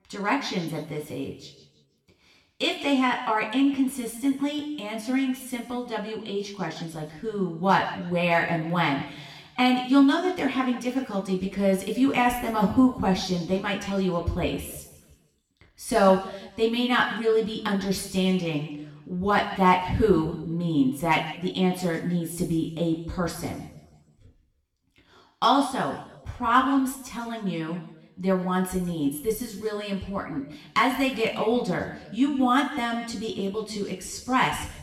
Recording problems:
room echo; slight; dies away in 1 s
off-mic speech; somewhat distant

